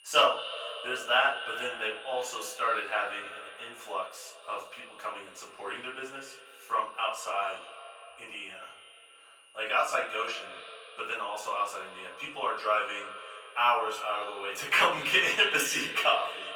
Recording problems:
echo of what is said; strong; throughout; 100 ms later, 10 dB below the speech
off-mic speech; far
thin; very; fading below 650 Hz
room echo; slight; dies away in 0.3 s
garbled, watery; slightly; nothing above 18 kHz
high-pitched whine; faint; throughout; 3 kHz, 25 dB below the speech

